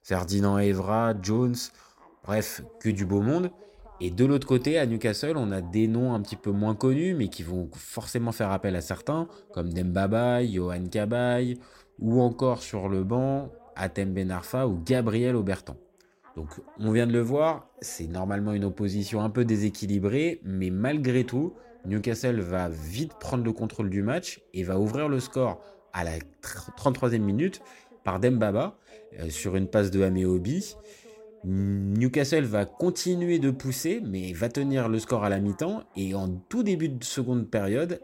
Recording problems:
voice in the background; faint; throughout; 25 dB below the speech

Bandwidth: 16 kHz